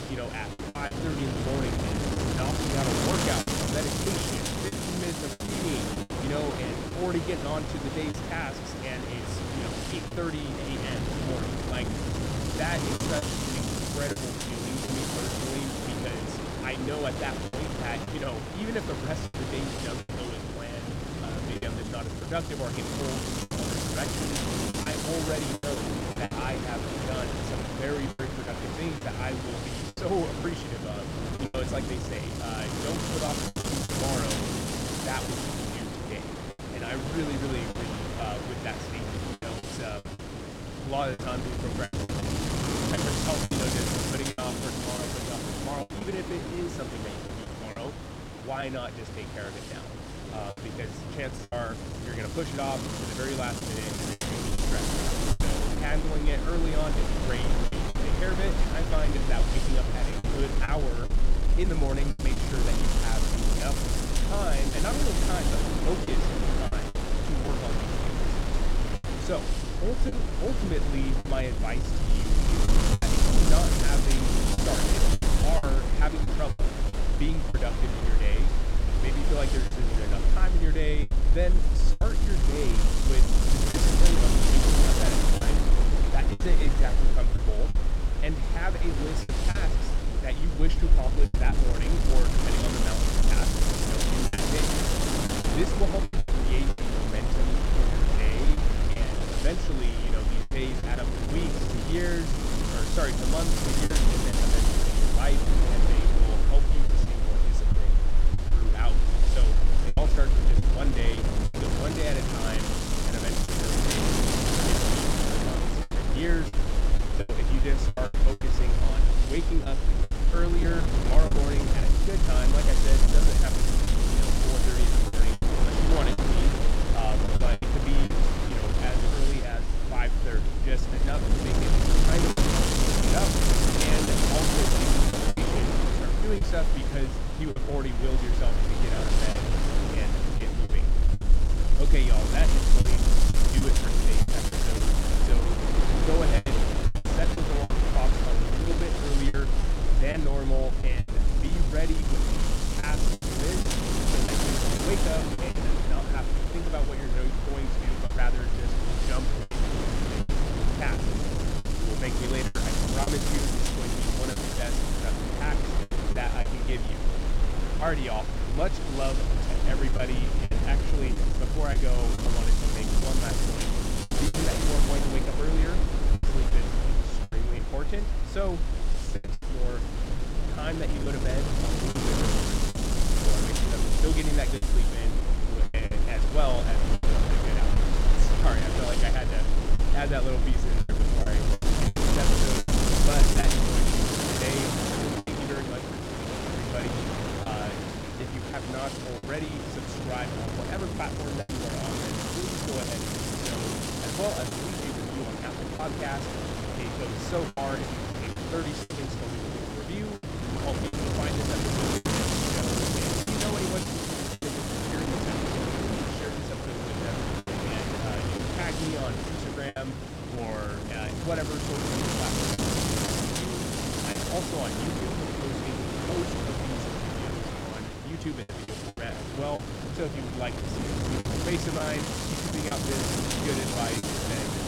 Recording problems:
wind noise on the microphone; heavy; 3 dB above the speech
low rumble; noticeable; from 54 s to 3:14; 15 dB below the speech
choppy; very; 5% of the speech affected

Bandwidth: 16.5 kHz